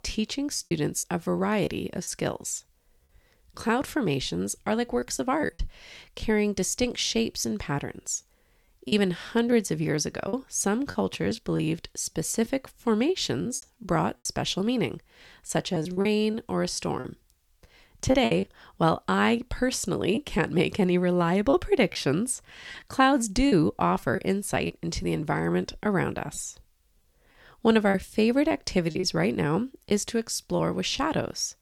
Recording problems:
choppy; very; 6% of the speech affected

